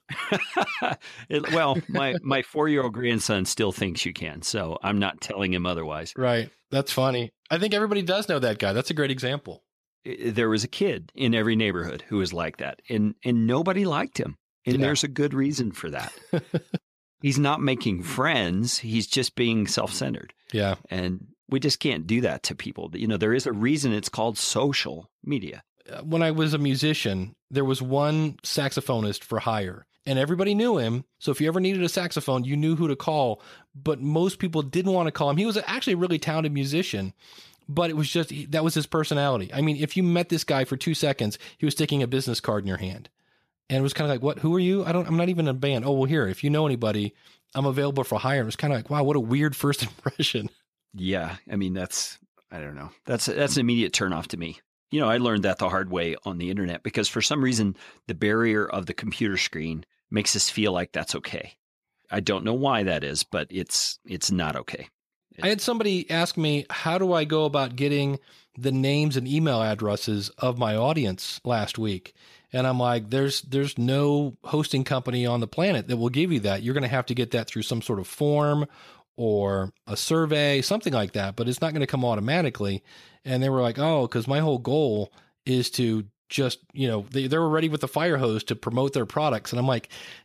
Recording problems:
none

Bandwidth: 14.5 kHz